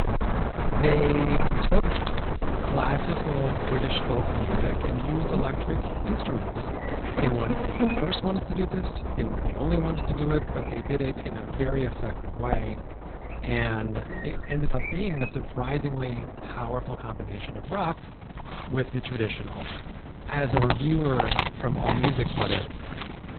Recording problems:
garbled, watery; badly; nothing above 4 kHz
distortion; slight; 2% of the sound clipped
animal sounds; loud; throughout; 2 dB below the speech

